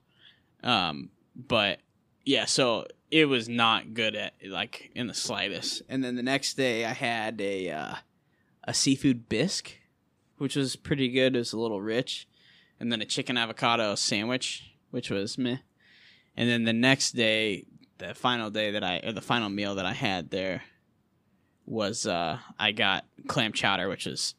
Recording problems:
none

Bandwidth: 15 kHz